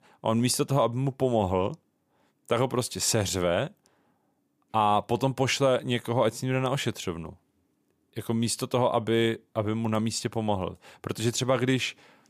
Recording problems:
none

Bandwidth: 15 kHz